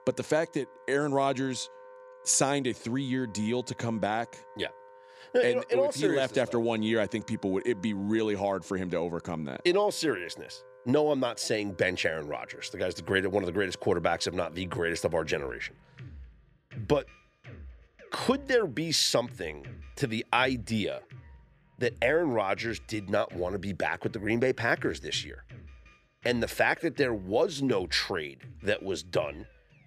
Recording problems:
background music; faint; throughout; 20 dB below the speech

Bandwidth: 14.5 kHz